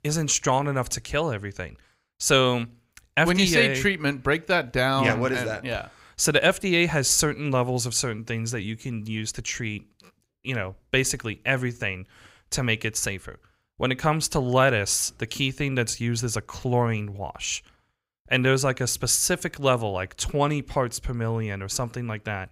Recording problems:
none

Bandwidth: 15.5 kHz